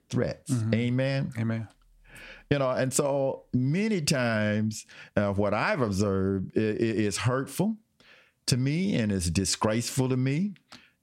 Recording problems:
squashed, flat; somewhat

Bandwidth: 16 kHz